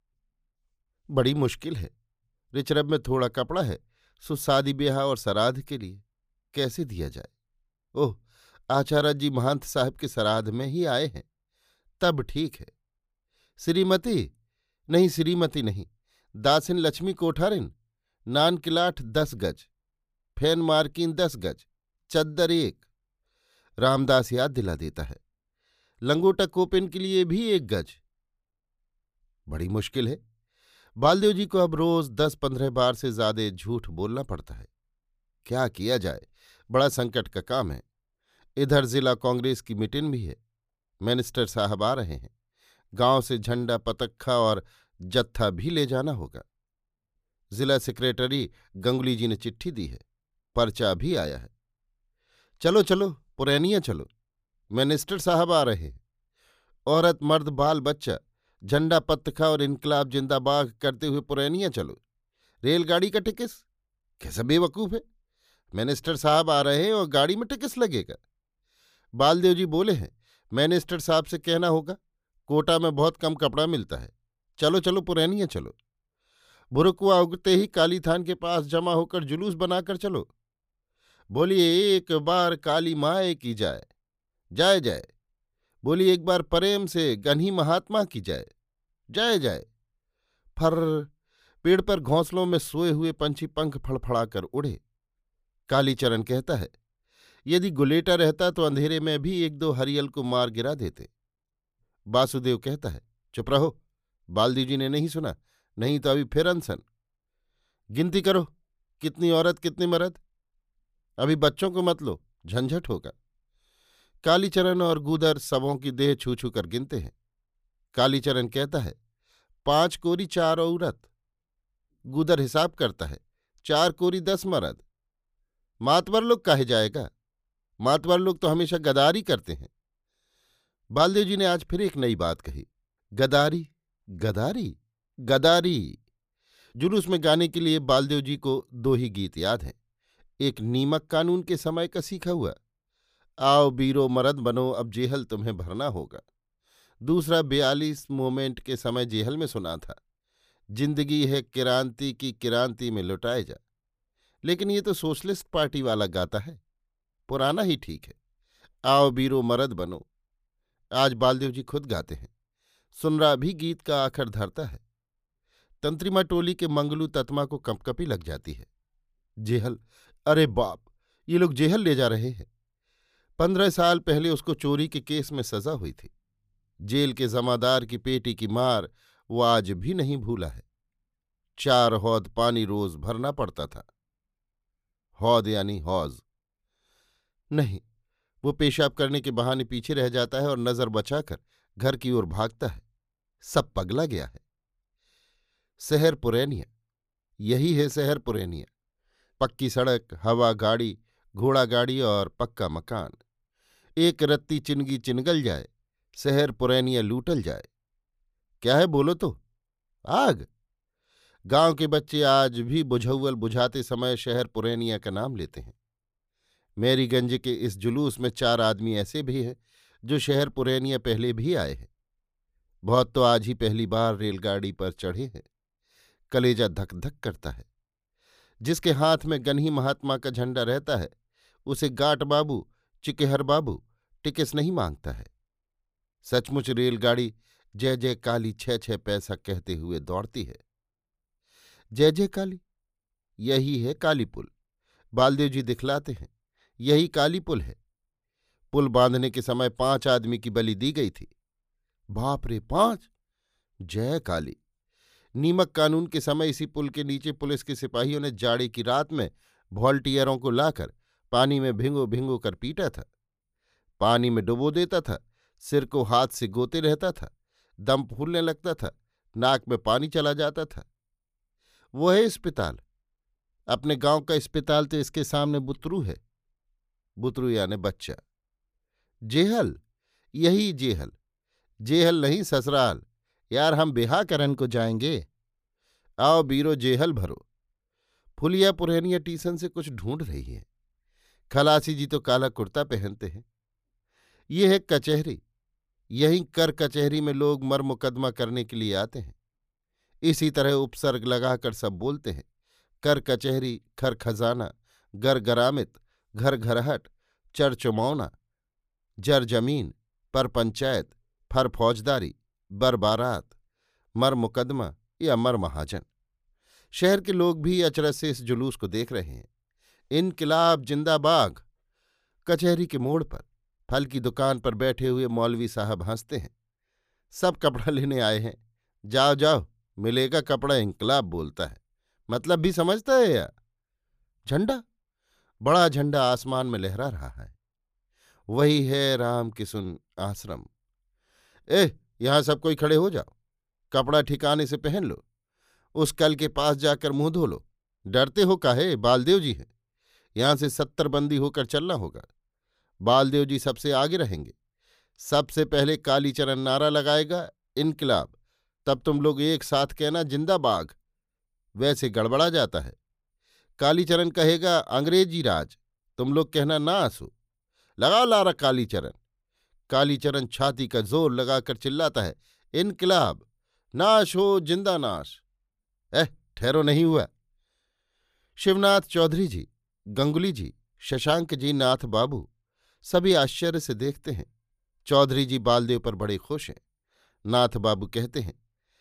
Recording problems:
none

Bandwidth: 15 kHz